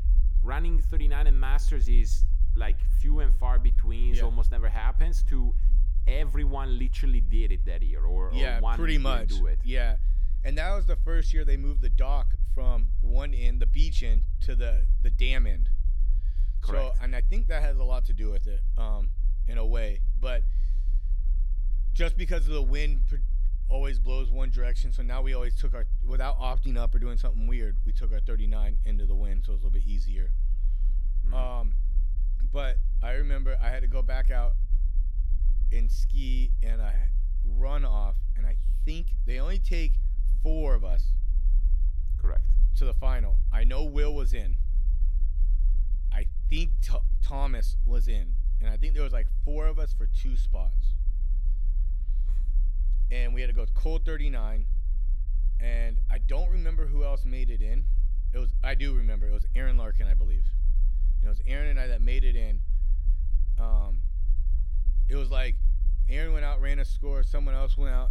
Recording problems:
low rumble; noticeable; throughout; 15 dB below the speech

